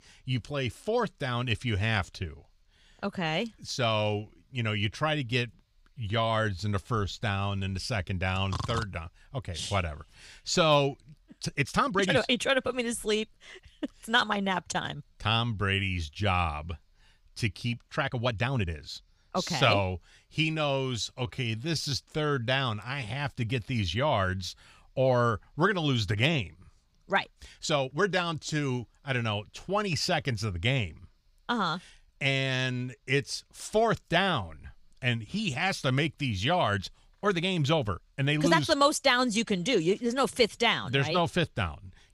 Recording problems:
uneven, jittery; strongly; from 6 to 38 s

